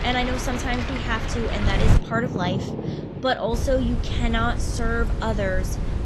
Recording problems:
garbled, watery; slightly; nothing above 12.5 kHz
rain or running water; loud; until 3.5 s; 5 dB below the speech
electrical hum; noticeable; throughout; 50 Hz, 20 dB below the speech
wind noise on the microphone; occasional gusts; until 2 s and from 3.5 s on; 10 dB below the speech

